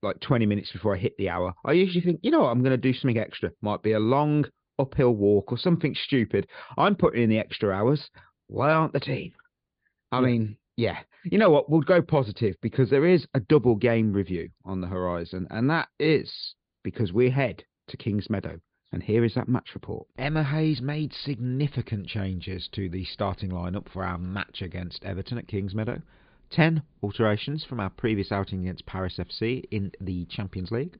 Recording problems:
high frequencies cut off; severe; nothing above 4.5 kHz

